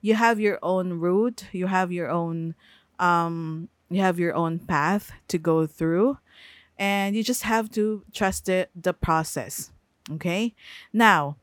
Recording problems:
none

